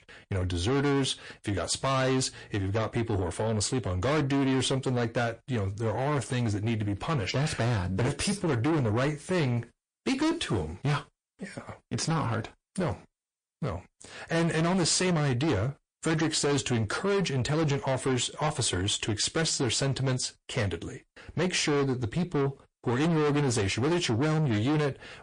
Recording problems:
distortion; heavy; 7 dB below the speech
garbled, watery; slightly; nothing above 9 kHz

